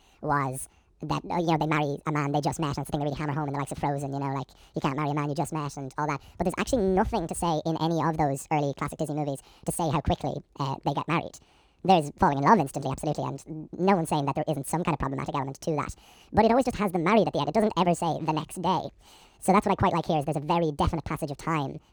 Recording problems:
wrong speed and pitch; too fast and too high; 1.7 times normal speed

